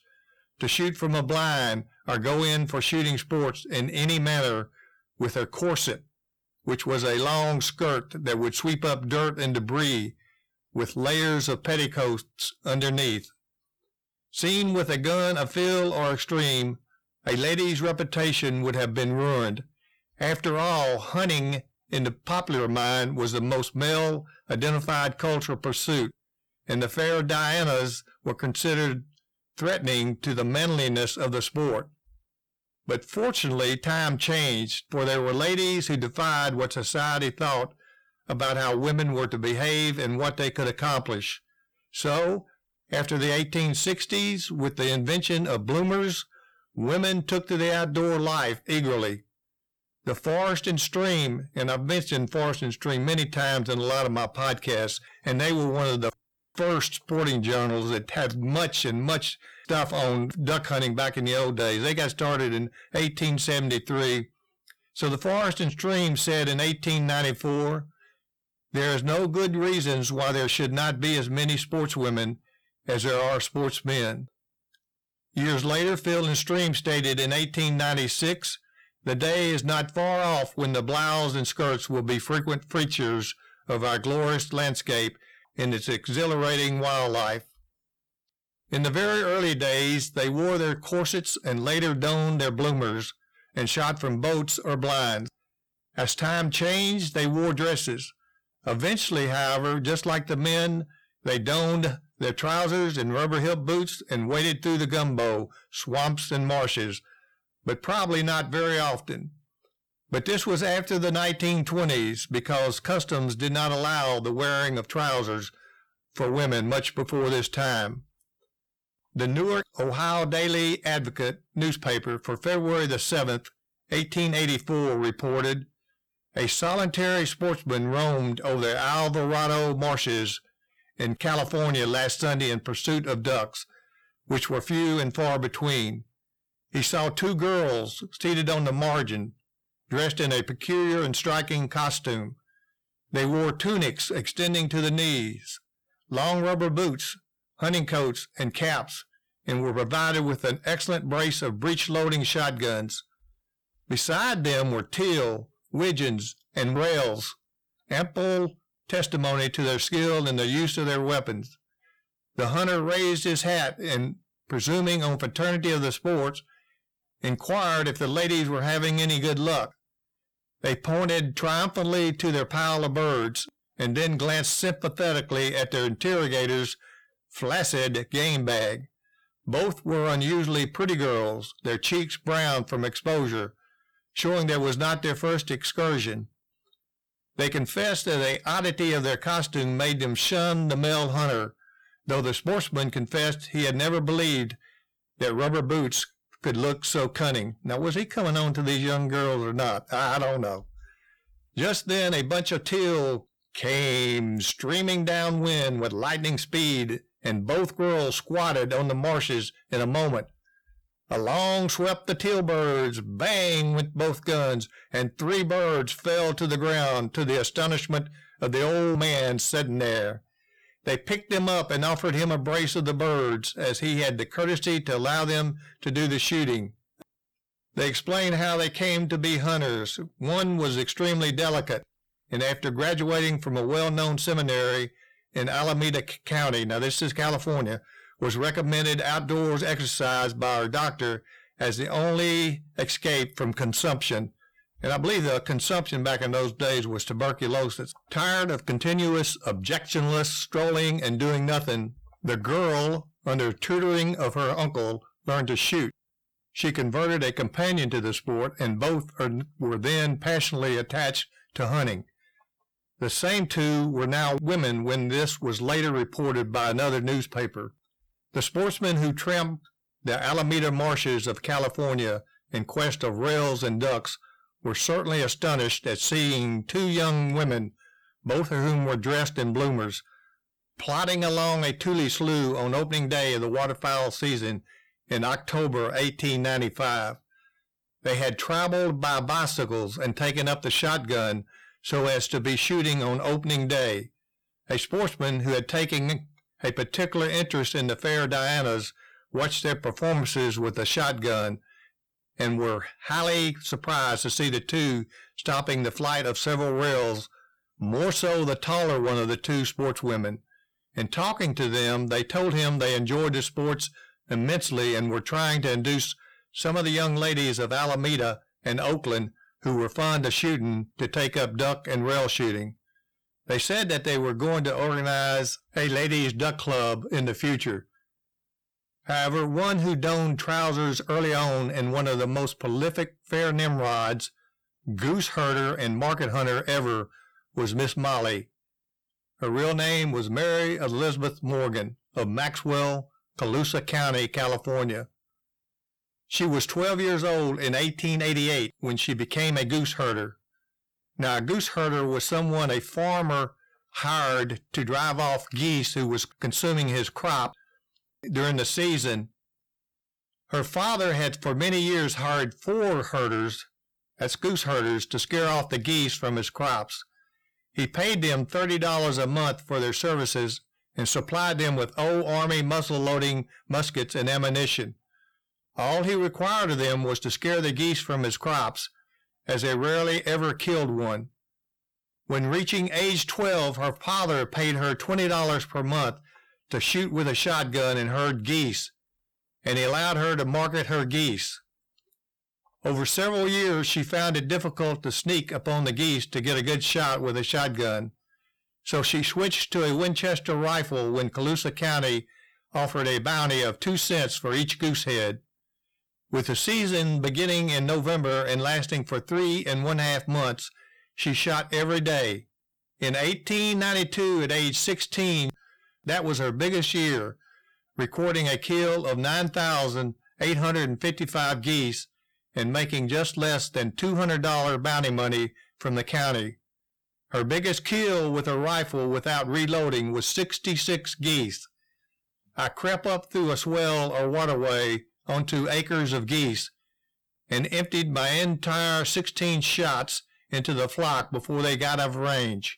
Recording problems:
distortion; heavy; 7 dB below the speech

